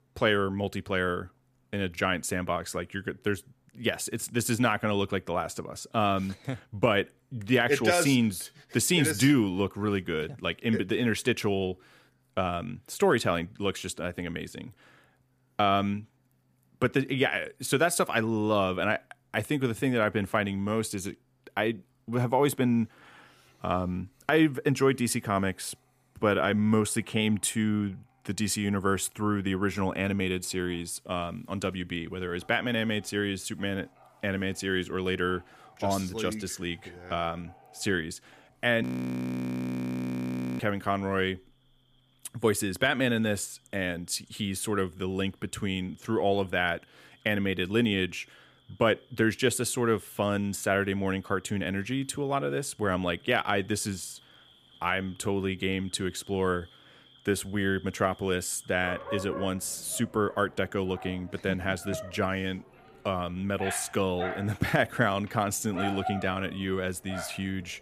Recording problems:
animal sounds; noticeable; throughout; 15 dB below the speech
audio freezing; at 39 s for 2 s

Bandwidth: 15 kHz